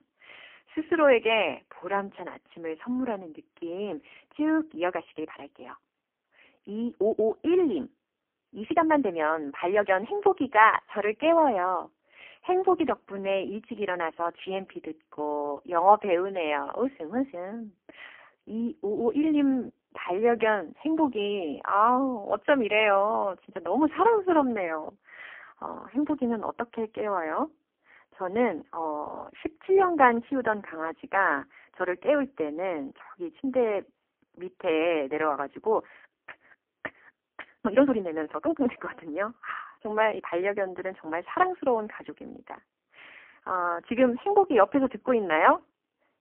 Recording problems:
phone-call audio; poor line; nothing above 3 kHz
uneven, jittery; strongly; from 0.5 to 40 s

